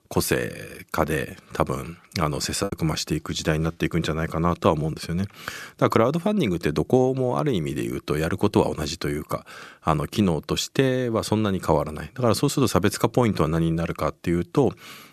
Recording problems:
choppy; very; at 2.5 s; 6% of the speech affected

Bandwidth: 13.5 kHz